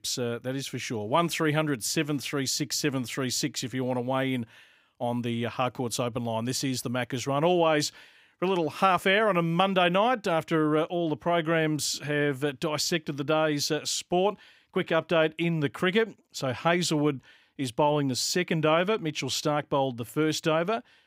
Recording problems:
none

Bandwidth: 15.5 kHz